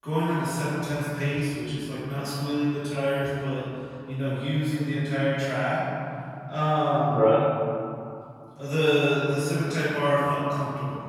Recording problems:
room echo; strong; dies away in 2.8 s
off-mic speech; far

